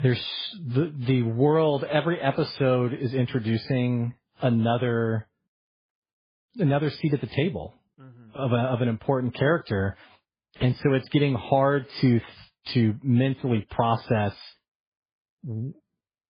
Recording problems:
garbled, watery; badly; nothing above 5 kHz

